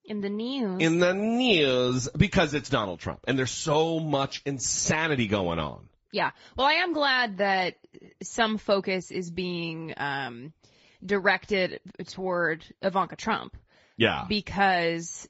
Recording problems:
high frequencies cut off; noticeable; nothing above 7.5 kHz
garbled, watery; slightly

